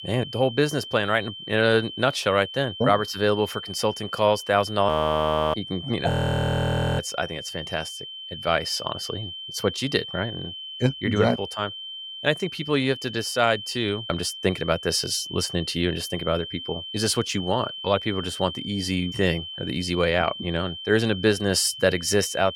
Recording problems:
high-pitched whine; loud; throughout; 3 kHz, 10 dB below the speech
audio freezing; at 5 s for 0.5 s and at 6 s for 1 s

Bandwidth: 17 kHz